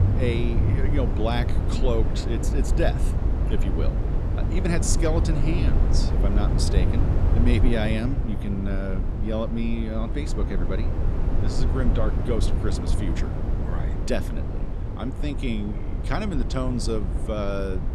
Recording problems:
low rumble; loud; throughout; 5 dB below the speech

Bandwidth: 15 kHz